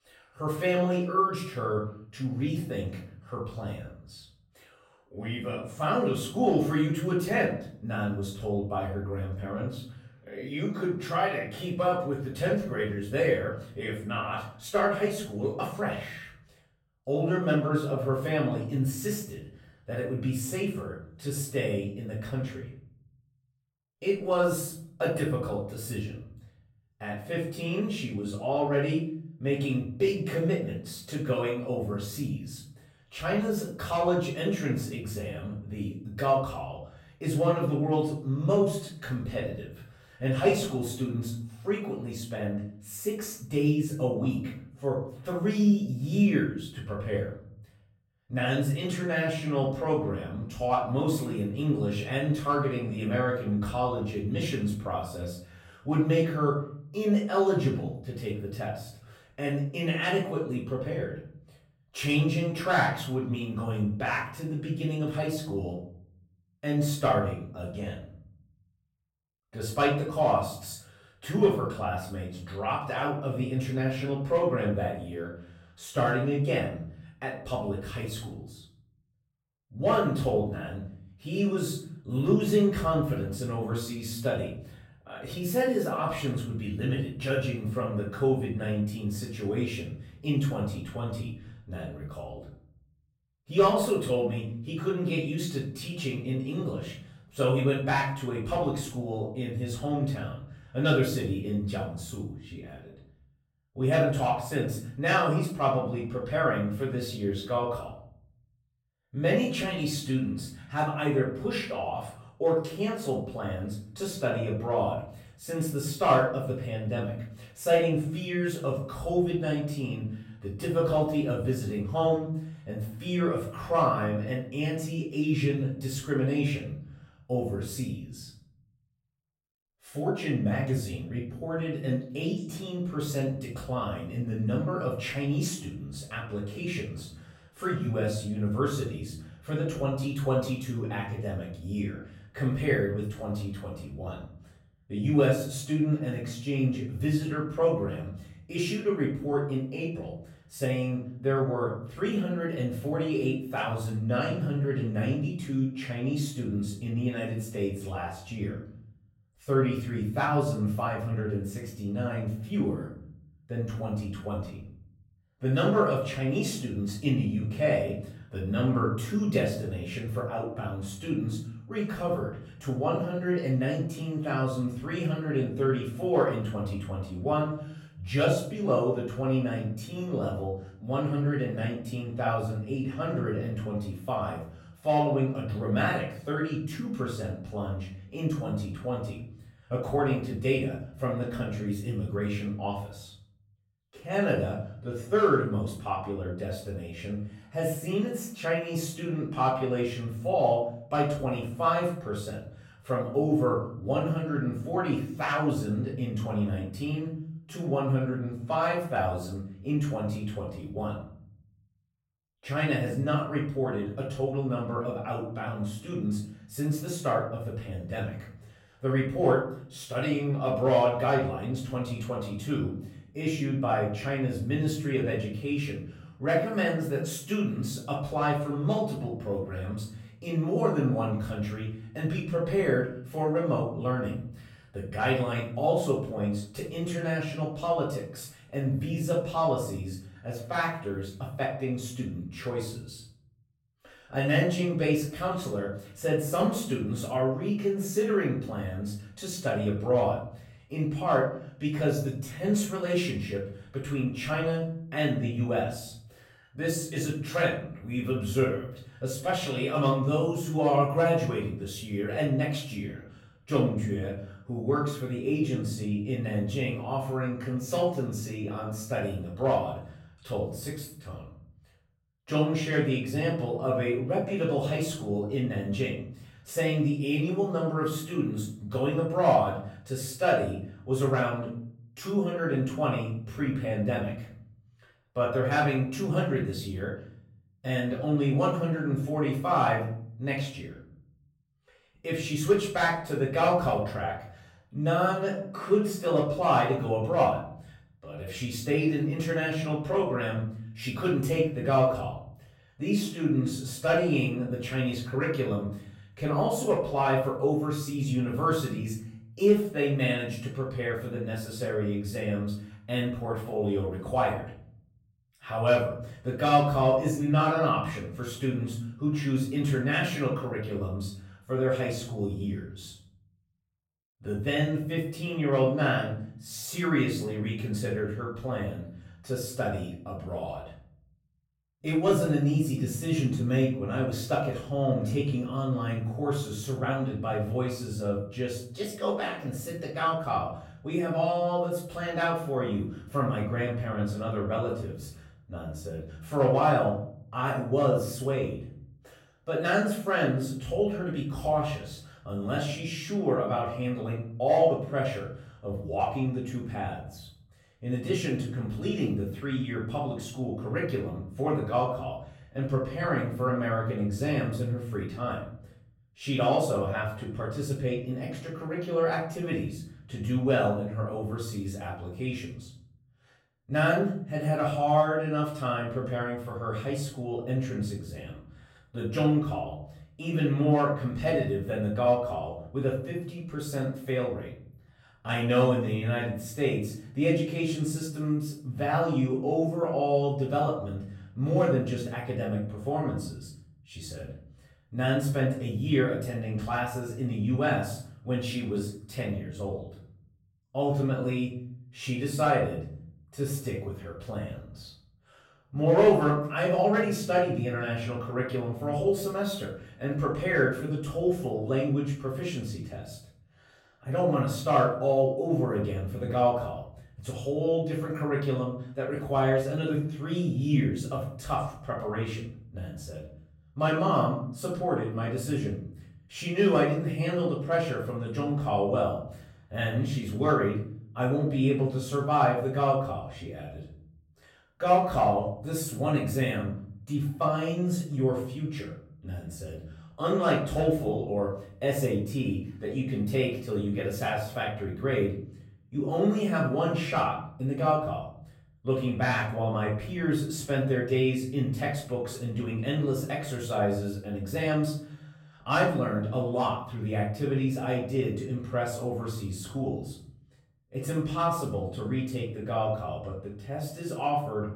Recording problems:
off-mic speech; far
room echo; noticeable; dies away in 0.7 s

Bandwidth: 16 kHz